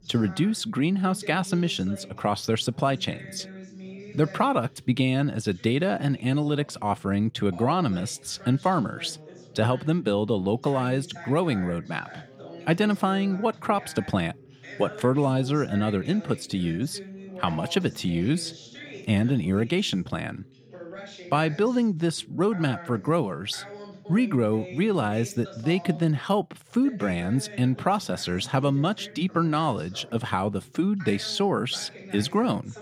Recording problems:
background chatter; noticeable; throughout; 2 voices, 15 dB below the speech

